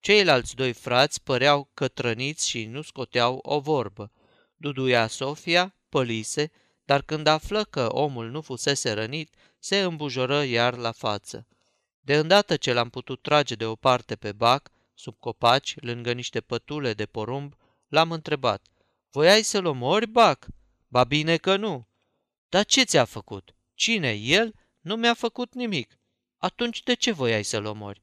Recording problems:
none

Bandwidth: 14.5 kHz